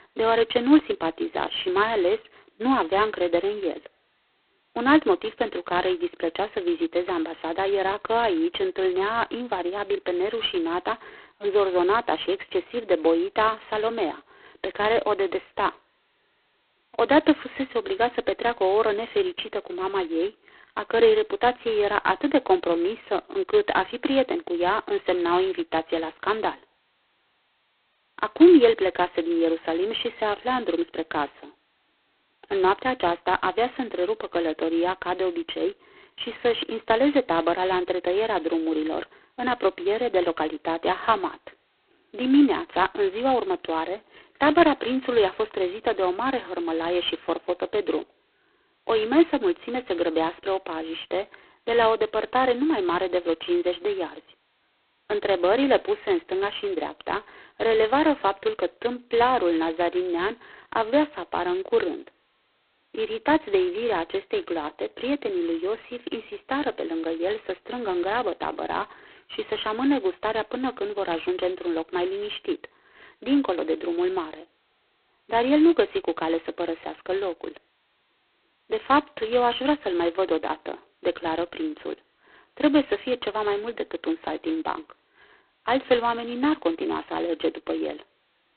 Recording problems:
phone-call audio; poor line; nothing above 4 kHz

